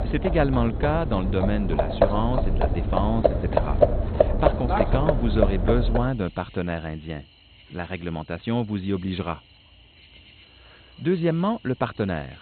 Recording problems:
garbled, watery; badly; nothing above 4 kHz
animal sounds; very loud; throughout; 2 dB above the speech

